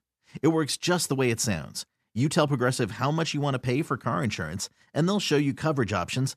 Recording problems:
none

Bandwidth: 14.5 kHz